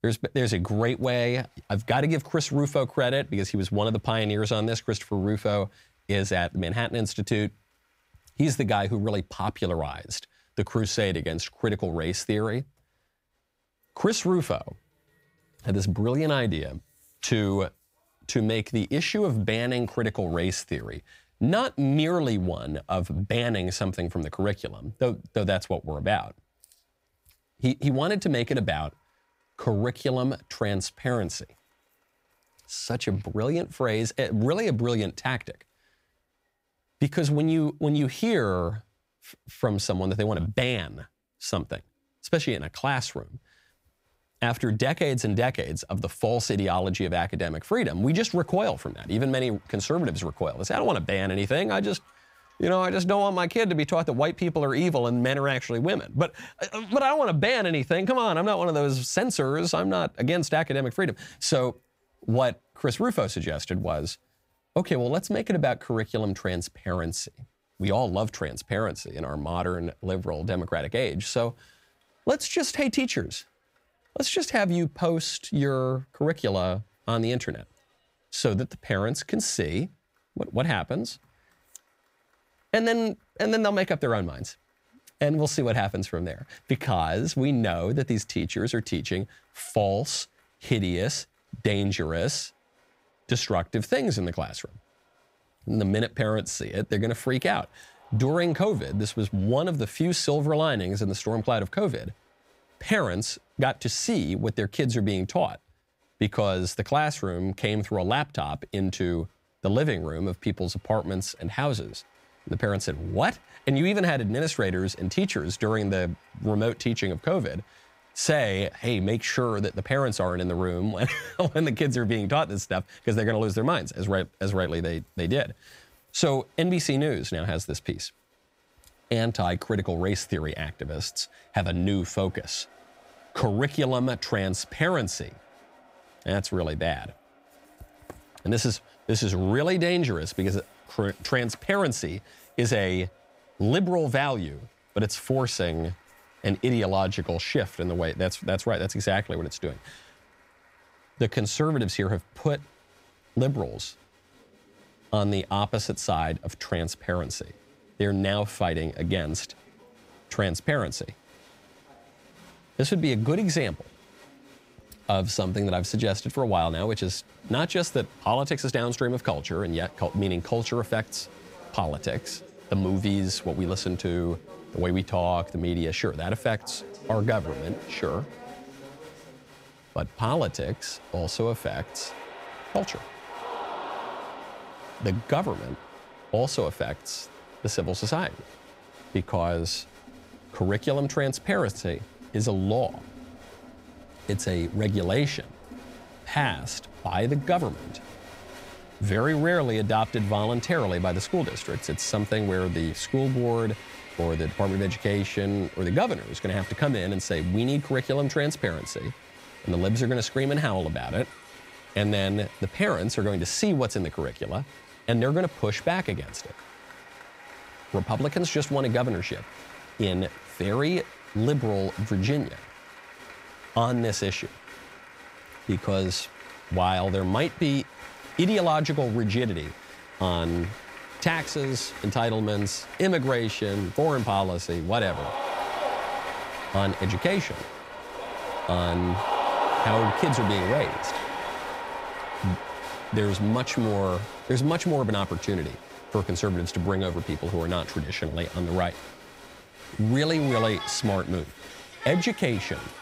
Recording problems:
crowd noise; noticeable; throughout; 10 dB below the speech

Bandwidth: 15.5 kHz